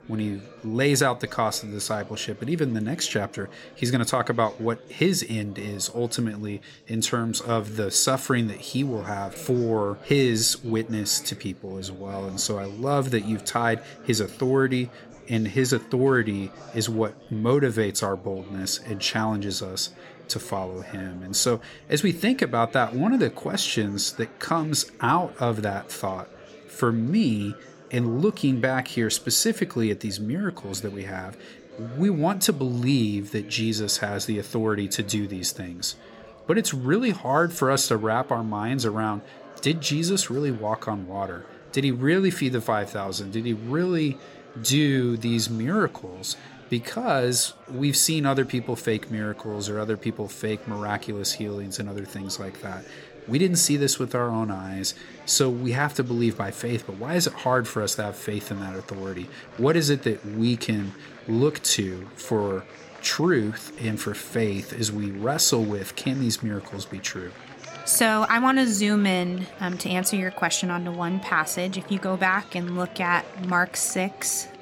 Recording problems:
chatter from many people; noticeable; throughout; 20 dB below the speech

